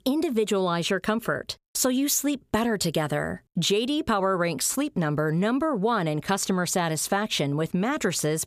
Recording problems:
squashed, flat; somewhat

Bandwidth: 15 kHz